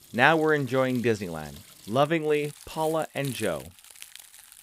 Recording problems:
household noises; noticeable; throughout; 20 dB below the speech

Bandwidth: 15.5 kHz